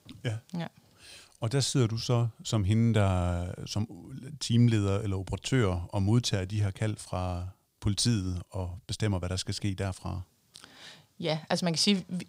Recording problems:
none

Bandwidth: 15.5 kHz